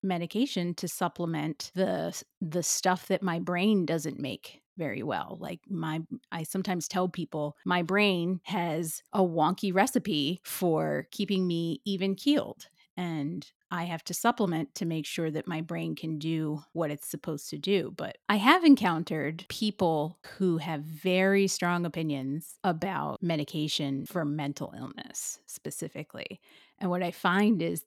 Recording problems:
none

